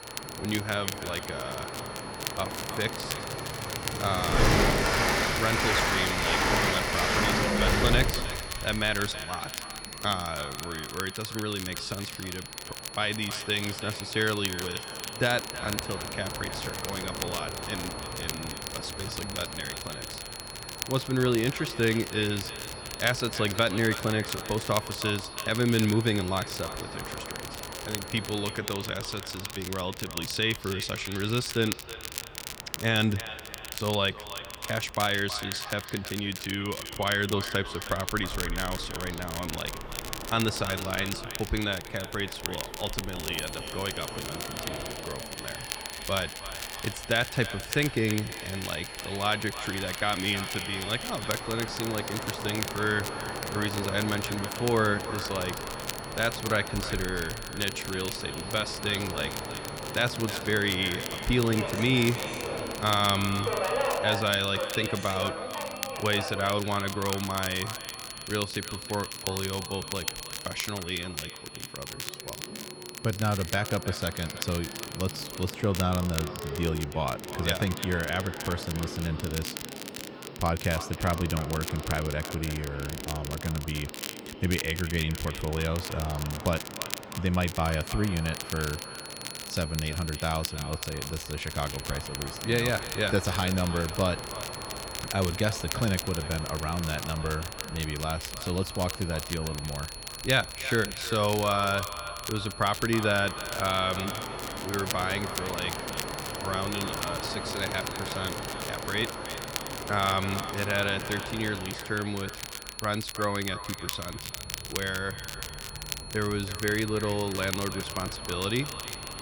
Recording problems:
echo of what is said; noticeable; throughout; 320 ms later, 15 dB below the speech
train or aircraft noise; loud; throughout; 6 dB below the speech
crackle, like an old record; loud; 8 dB below the speech
high-pitched whine; noticeable; until 29 s, from 43 s to 1:15 and from 1:28 on; 4.5 kHz, 15 dB below the speech

